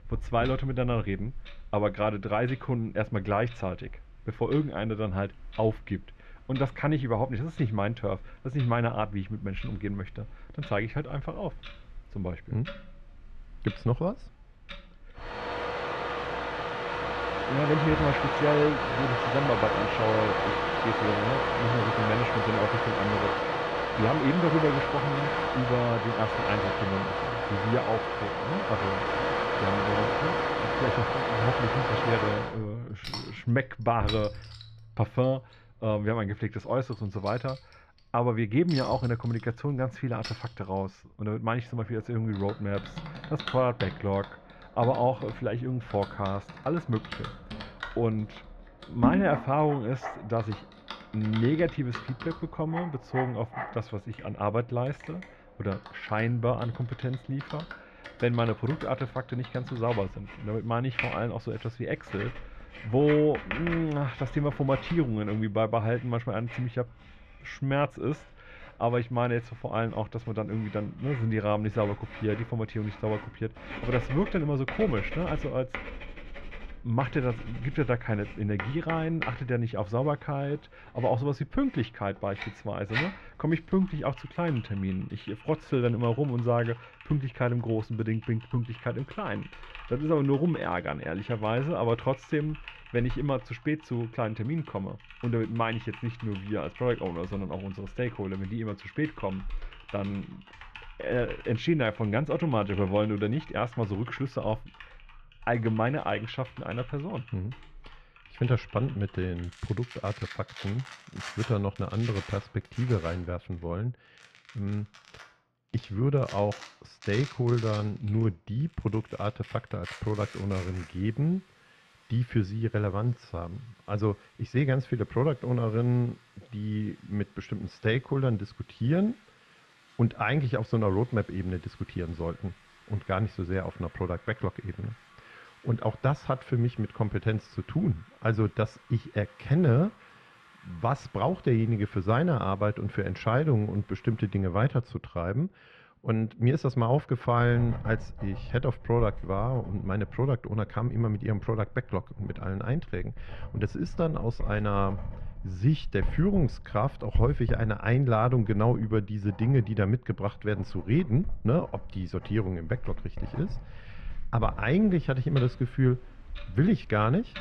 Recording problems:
muffled; very; fading above 2 kHz
household noises; loud; throughout; 4 dB below the speech

